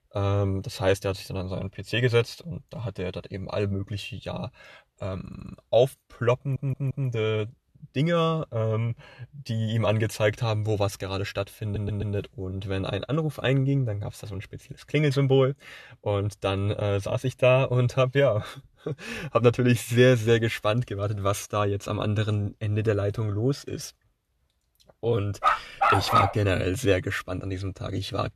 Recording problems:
audio stuttering; at 5 s, at 6.5 s and at 12 s
dog barking; loud; at 25 s; peak 6 dB above the speech

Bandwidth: 13.5 kHz